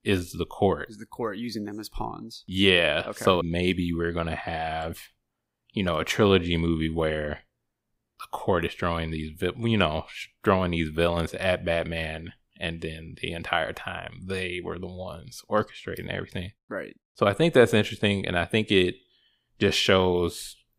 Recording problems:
none

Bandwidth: 15.5 kHz